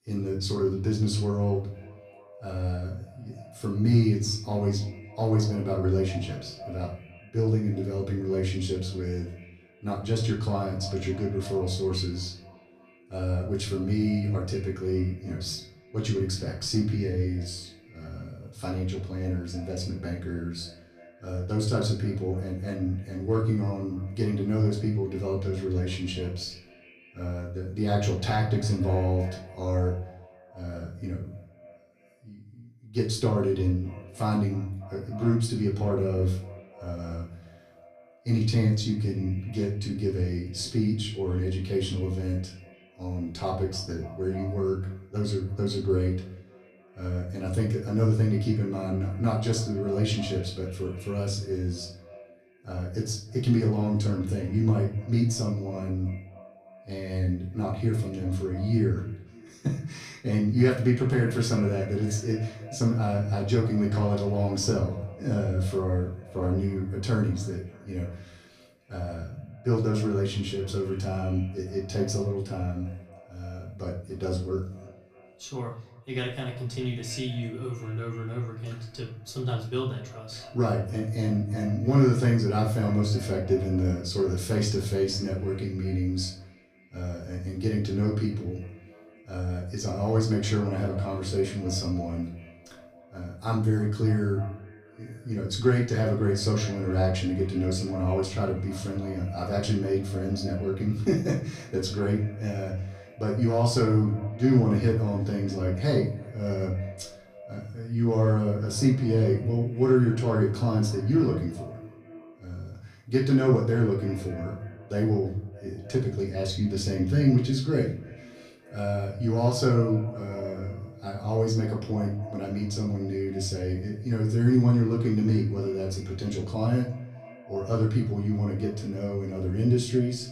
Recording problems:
off-mic speech; far
echo of what is said; faint; throughout; 300 ms later, 20 dB below the speech
room echo; slight; dies away in 0.4 s

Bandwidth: 15 kHz